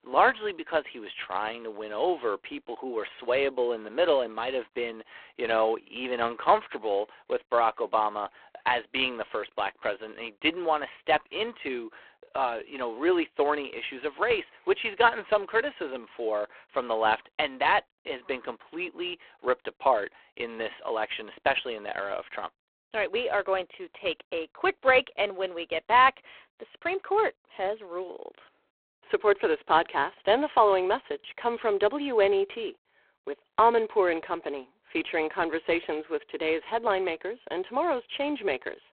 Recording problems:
phone-call audio; poor line

